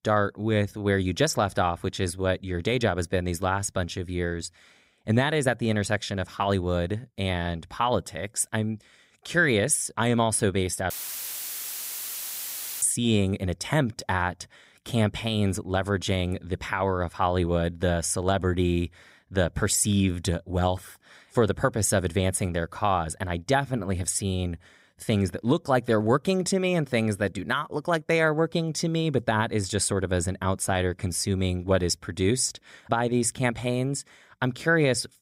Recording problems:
audio cutting out; filled with static; at 11 s for 2 s

